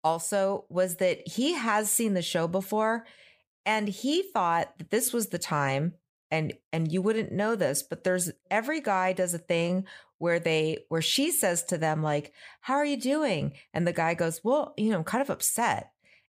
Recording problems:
none

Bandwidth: 15 kHz